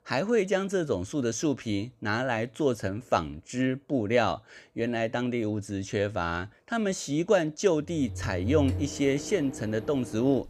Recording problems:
household noises; loud; from 8.5 s on; 9 dB below the speech

